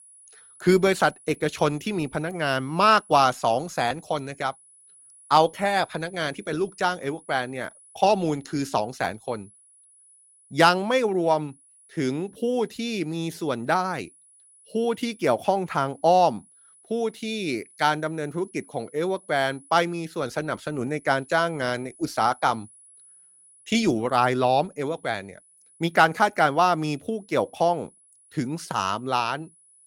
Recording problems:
high-pitched whine; faint; throughout; 10 kHz, 25 dB below the speech

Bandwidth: 16 kHz